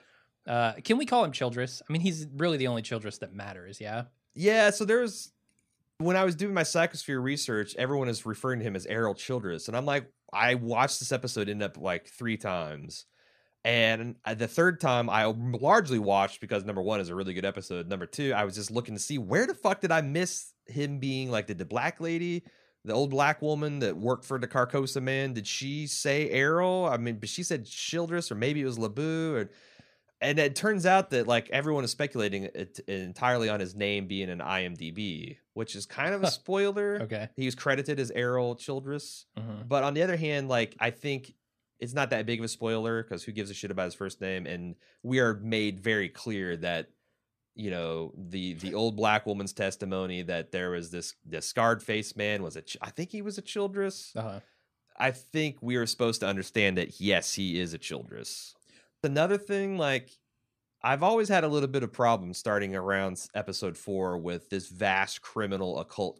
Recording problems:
none

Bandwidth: 14.5 kHz